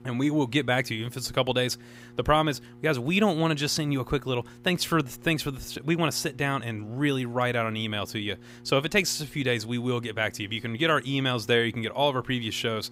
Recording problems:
electrical hum; faint; throughout; 60 Hz, 30 dB below the speech

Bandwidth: 15.5 kHz